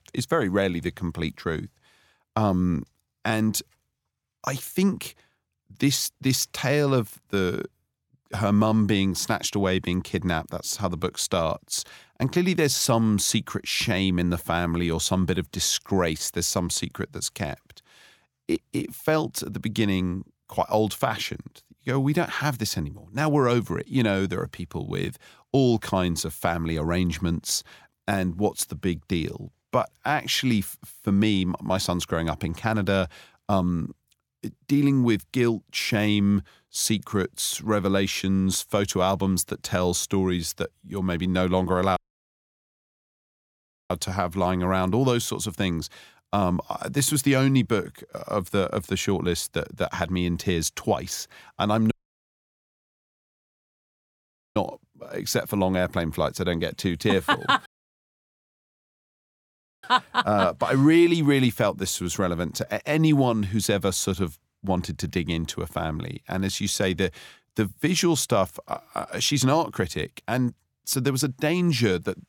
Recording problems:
audio cutting out; at 42 s for 2 s, at 52 s for 2.5 s and at 58 s for 2 s

